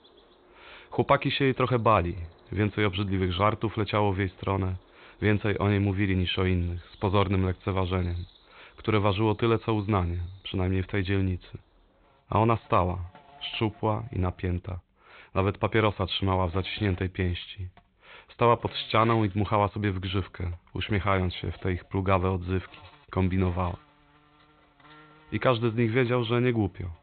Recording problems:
high frequencies cut off; severe; nothing above 4 kHz
animal sounds; faint; throughout; 25 dB below the speech

